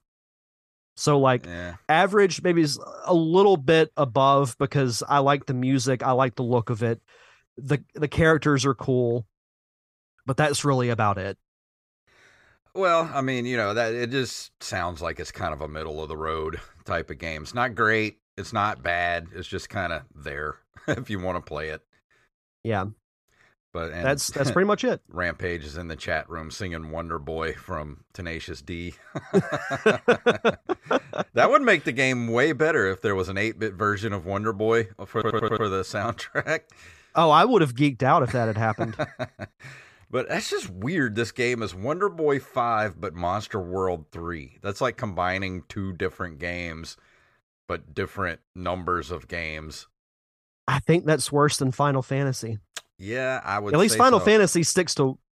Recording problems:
audio stuttering; at 35 s

